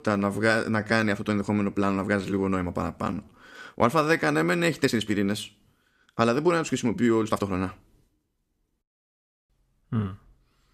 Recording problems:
uneven, jittery; strongly; from 1 to 10 s

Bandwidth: 14.5 kHz